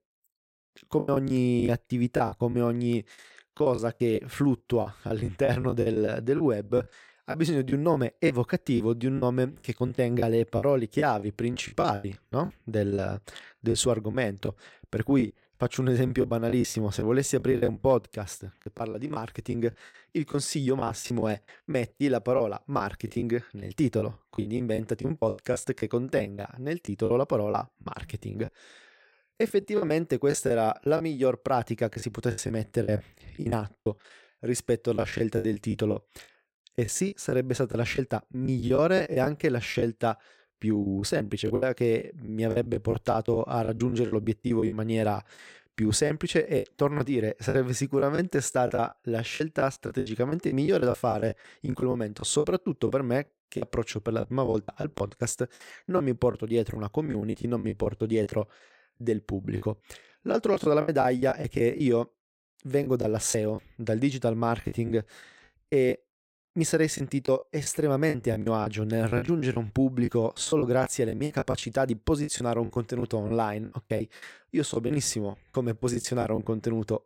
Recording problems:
choppy; very; 12% of the speech affected

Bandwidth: 16 kHz